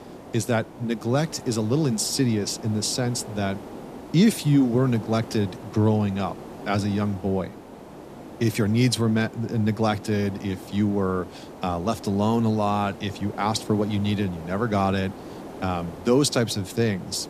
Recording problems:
hiss; noticeable; throughout; 15 dB below the speech

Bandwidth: 14.5 kHz